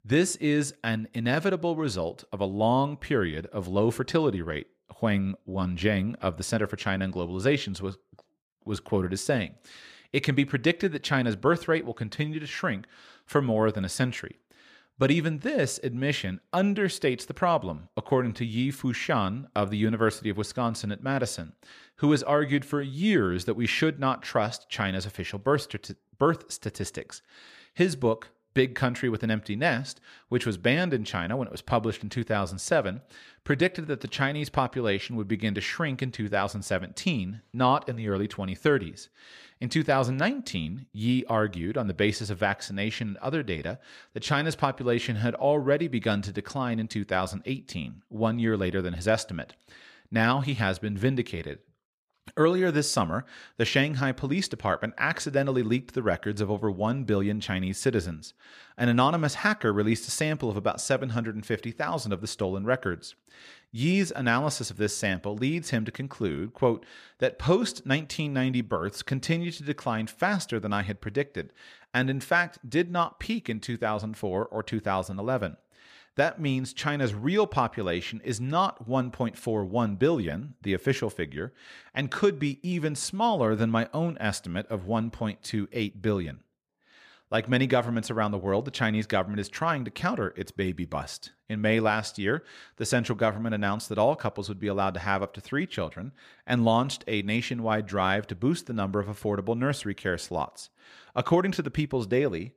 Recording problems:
none

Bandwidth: 14.5 kHz